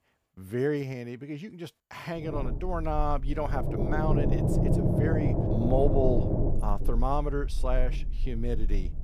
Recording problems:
low rumble; loud; from 2.5 s on; 1 dB below the speech

